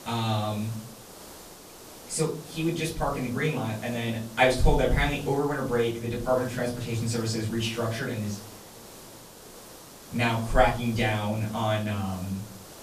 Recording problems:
off-mic speech; far
room echo; slight; dies away in 0.5 s
hiss; noticeable; throughout; 15 dB below the speech

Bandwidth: 14.5 kHz